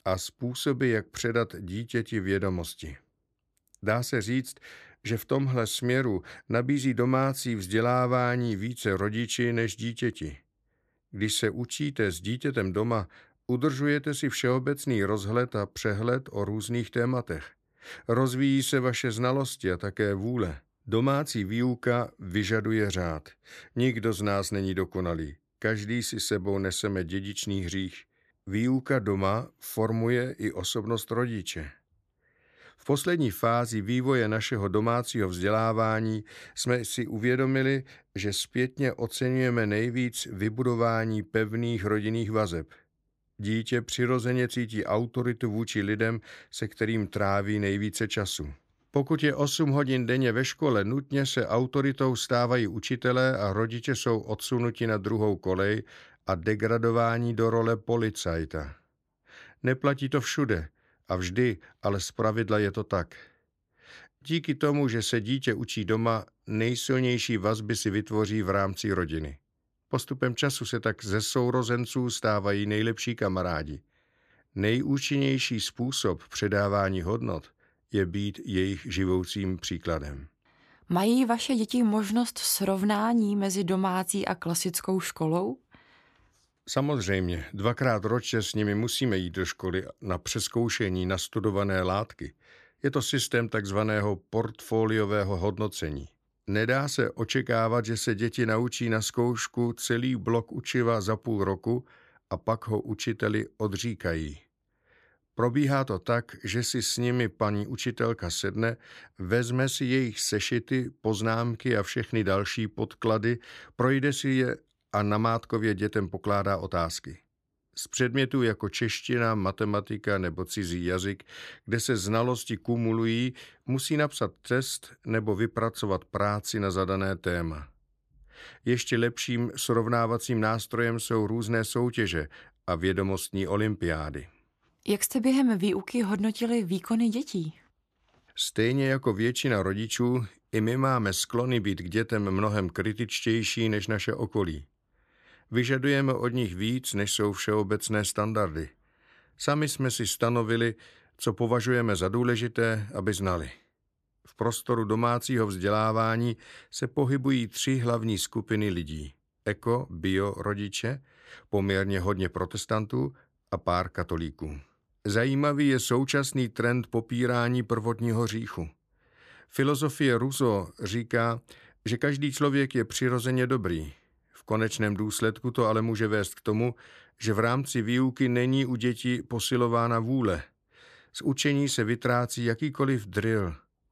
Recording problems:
none

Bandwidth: 14 kHz